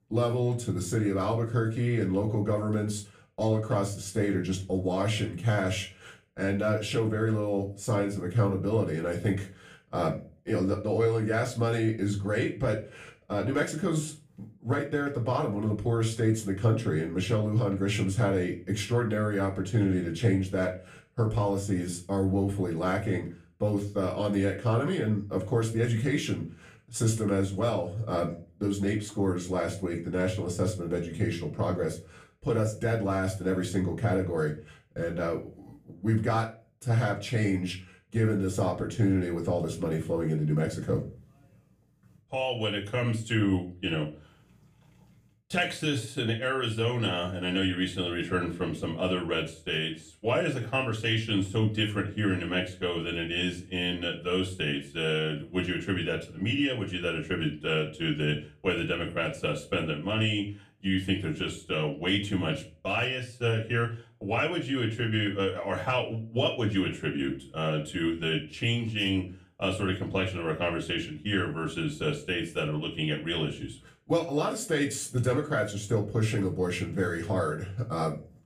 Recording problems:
off-mic speech; far
room echo; very slight; dies away in 0.3 s

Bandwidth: 15 kHz